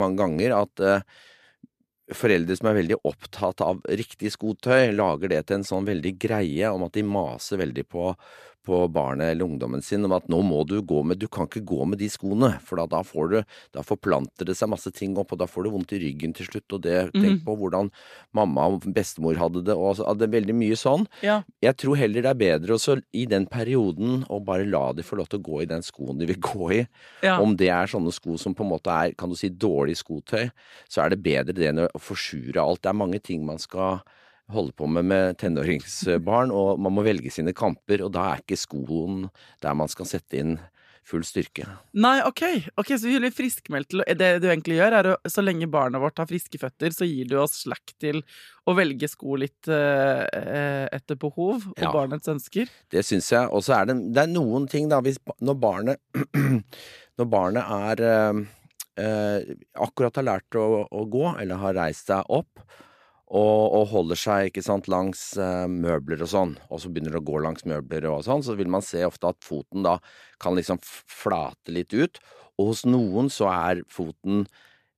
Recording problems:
abrupt cut into speech; at the start

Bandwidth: 14.5 kHz